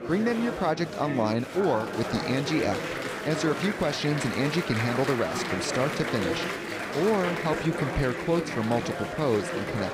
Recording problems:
murmuring crowd; loud; throughout; 3 dB below the speech

